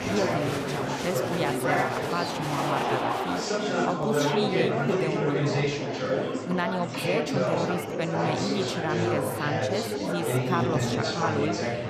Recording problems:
murmuring crowd; very loud; throughout; 4 dB above the speech

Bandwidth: 14.5 kHz